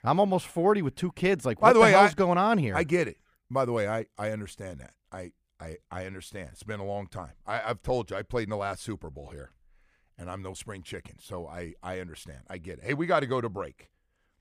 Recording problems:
none

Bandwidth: 15 kHz